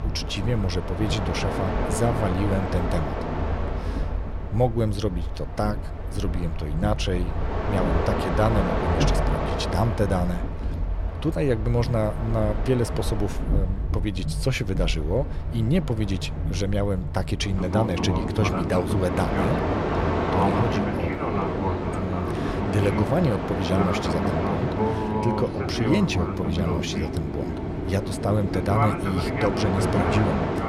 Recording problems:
train or aircraft noise; loud; throughout; as loud as the speech

